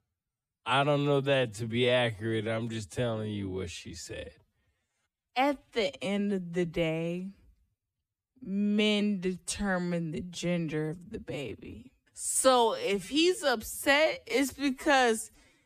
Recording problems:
wrong speed, natural pitch; too slow; 0.5 times normal speed

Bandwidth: 15 kHz